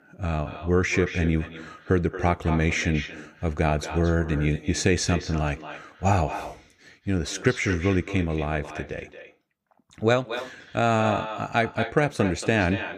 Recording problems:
echo of what is said; strong; throughout; 230 ms later, 10 dB below the speech

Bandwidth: 15.5 kHz